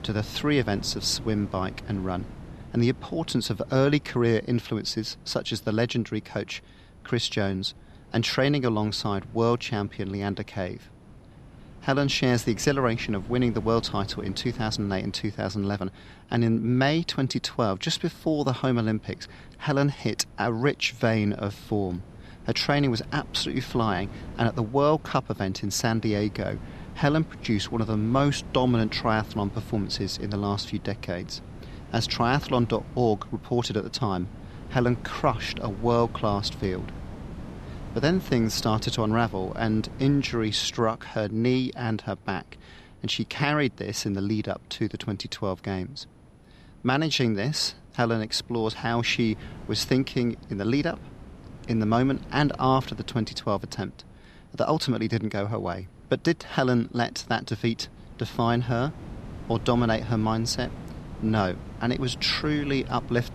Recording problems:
wind noise on the microphone; occasional gusts; 20 dB below the speech

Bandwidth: 13.5 kHz